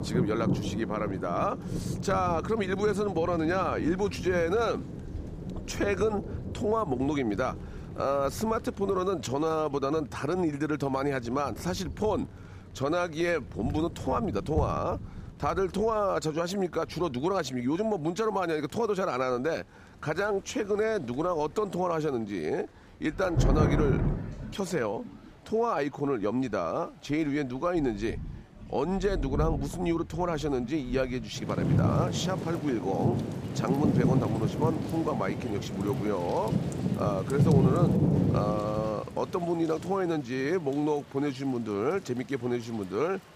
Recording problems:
rain or running water; loud; throughout; 2 dB below the speech

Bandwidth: 15 kHz